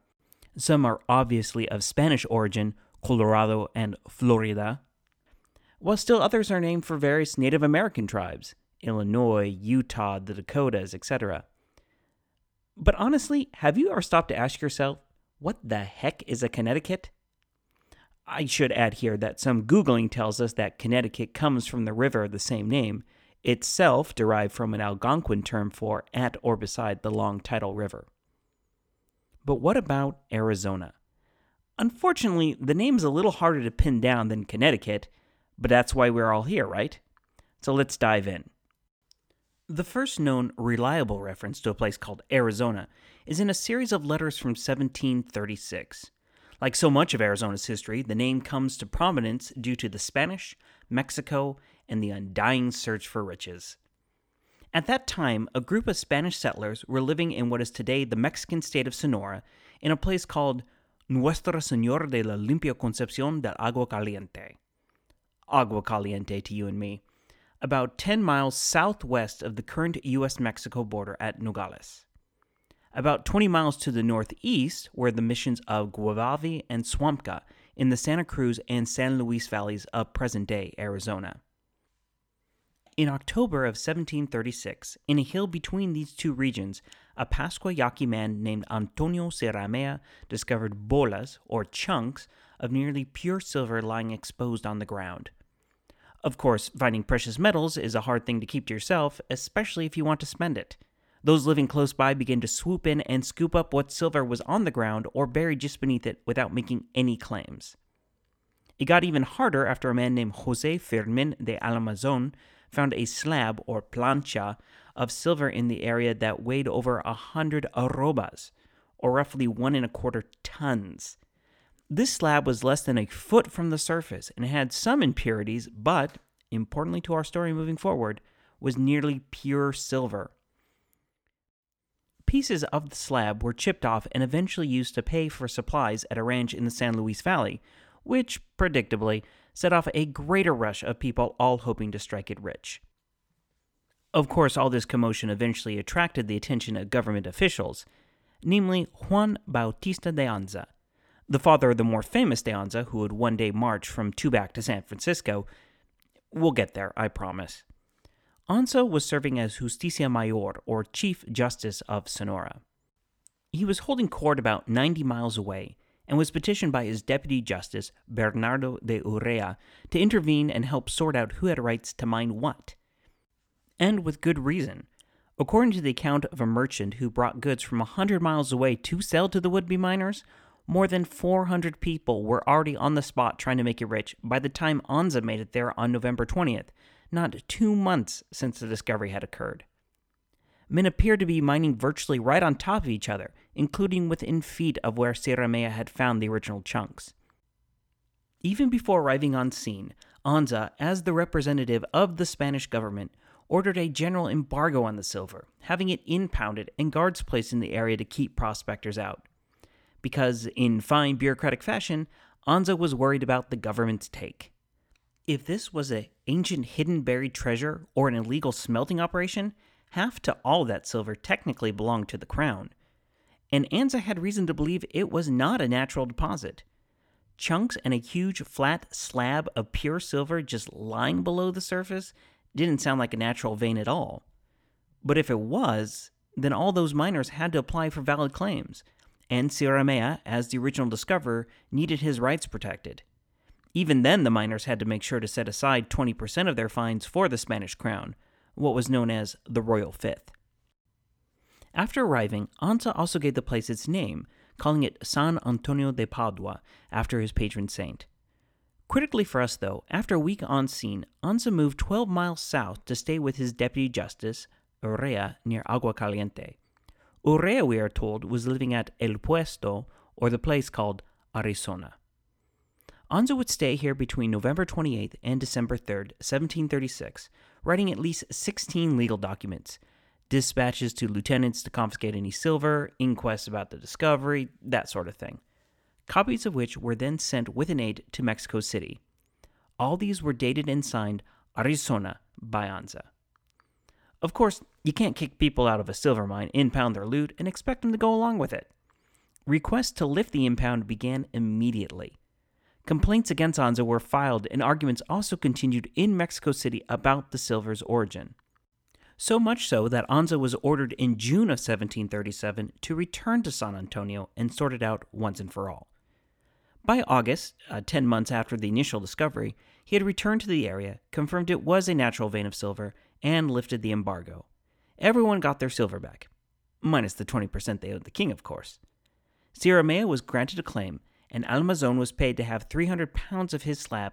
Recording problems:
none

